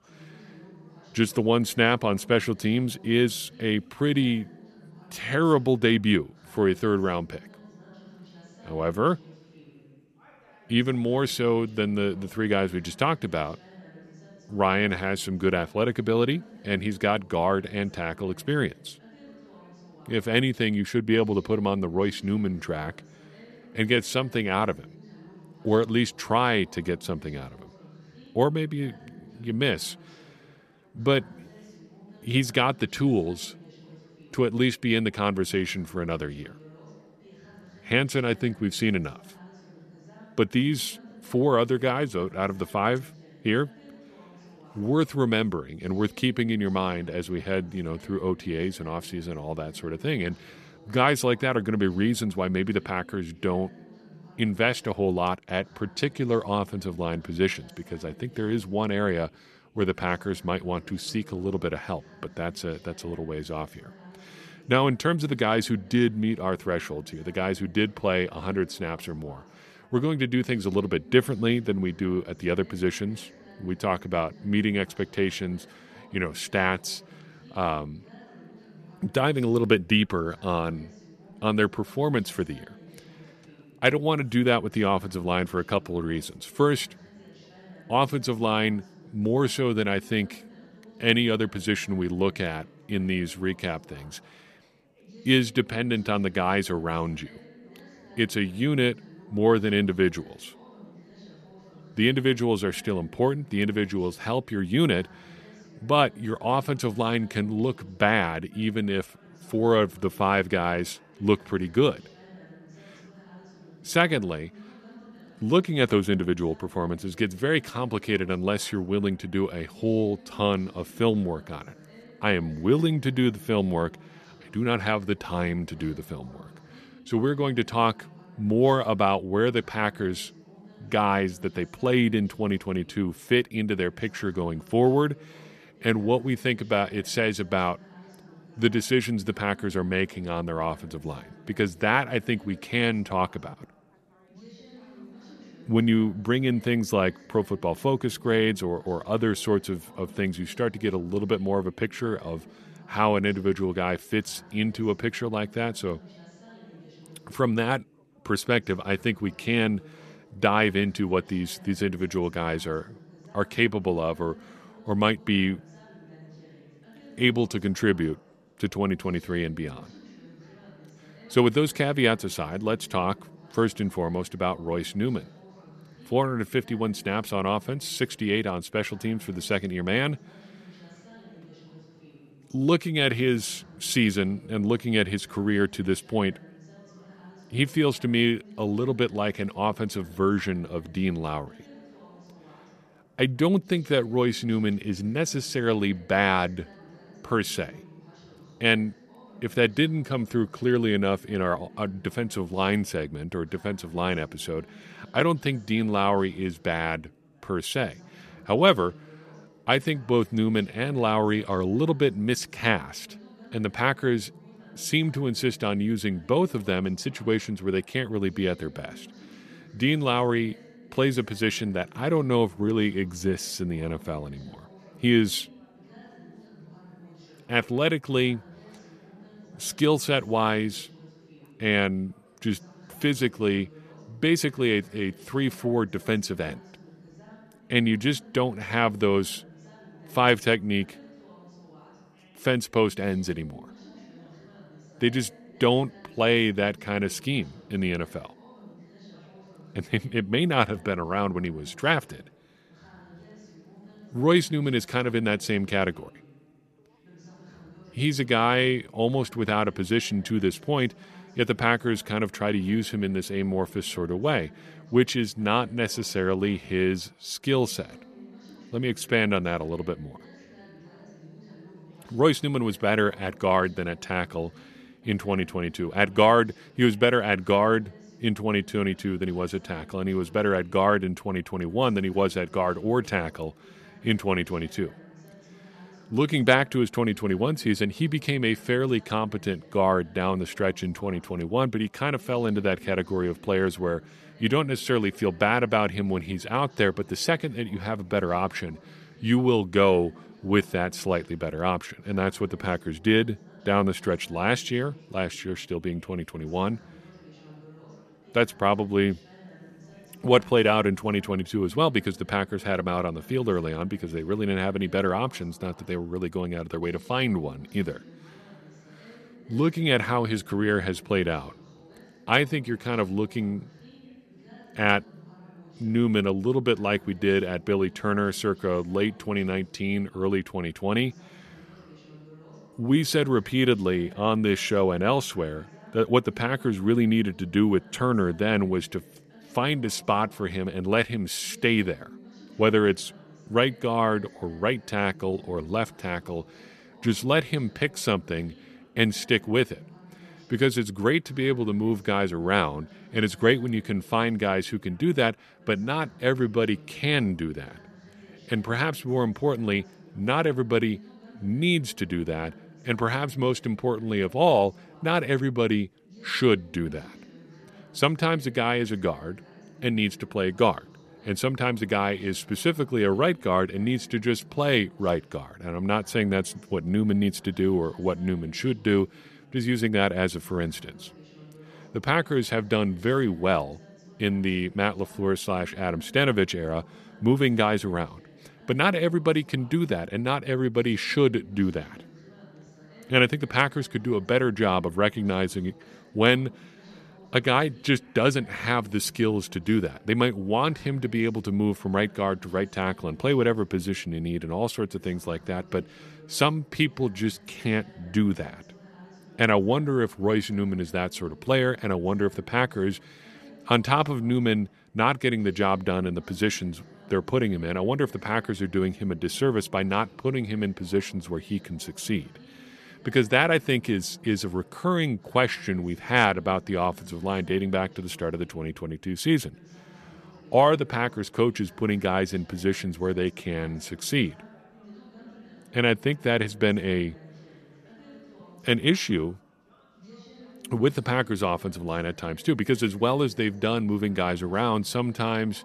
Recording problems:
background chatter; faint; throughout; 3 voices, 25 dB below the speech

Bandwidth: 14 kHz